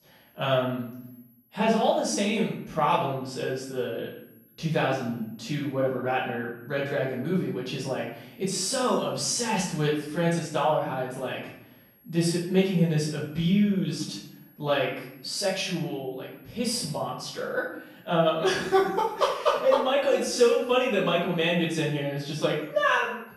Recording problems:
off-mic speech; far
room echo; noticeable; dies away in 0.6 s
high-pitched whine; faint; throughout; 11.5 kHz, 30 dB below the speech

